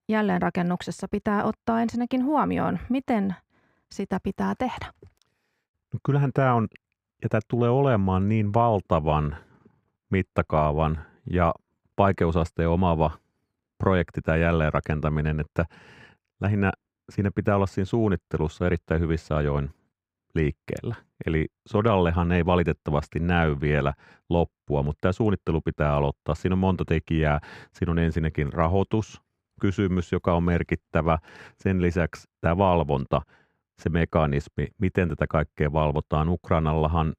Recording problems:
muffled; slightly; fading above 3.5 kHz

